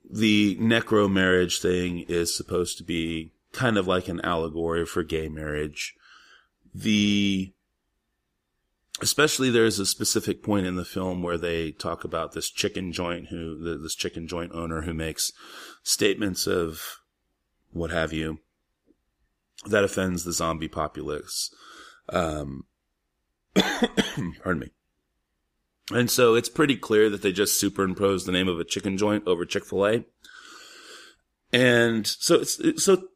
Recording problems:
none

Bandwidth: 15 kHz